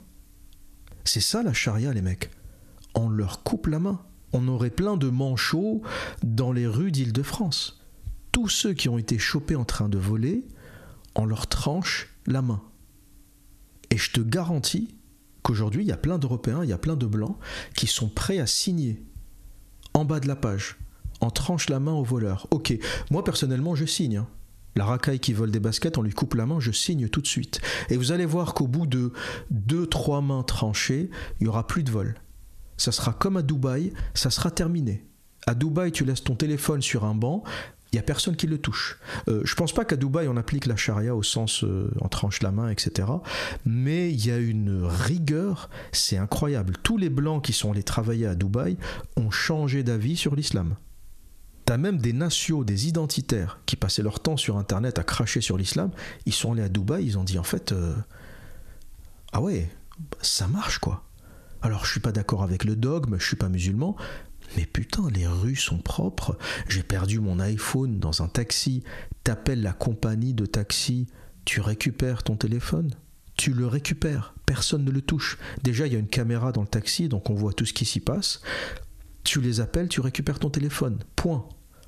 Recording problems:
squashed, flat; heavily

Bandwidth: 14 kHz